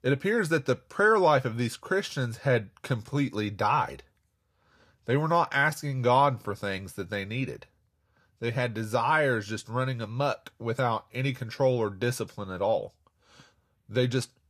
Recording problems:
none

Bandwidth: 14.5 kHz